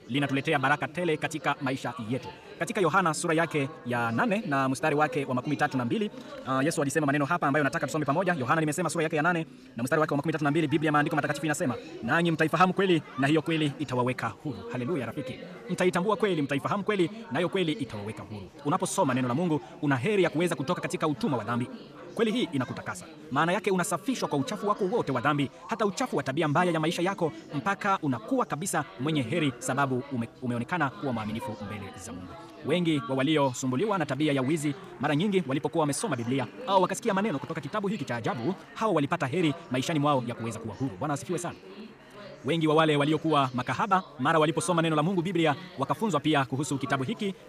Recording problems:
wrong speed, natural pitch; too fast; 1.6 times normal speed
chatter from many people; noticeable; throughout; 15 dB below the speech

